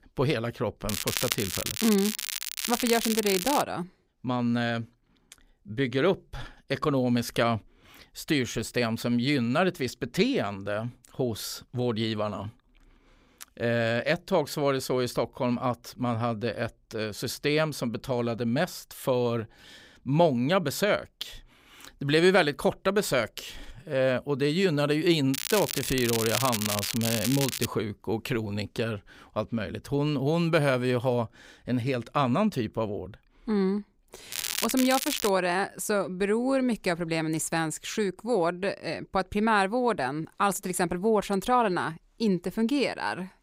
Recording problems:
crackling; loud; from 1 to 3.5 s, from 25 to 28 s and at 34 s; 3 dB below the speech

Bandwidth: 15.5 kHz